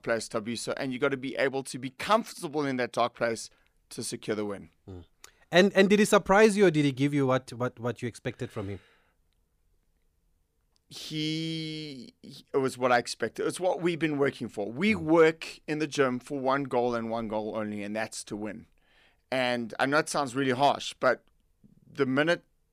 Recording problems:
none

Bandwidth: 15 kHz